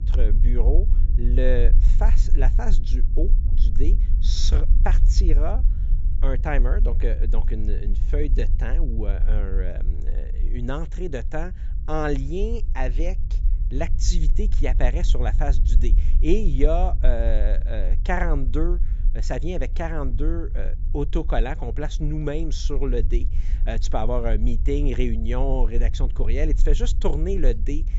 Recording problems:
high frequencies cut off; noticeable; nothing above 8 kHz
low rumble; noticeable; throughout; 15 dB below the speech

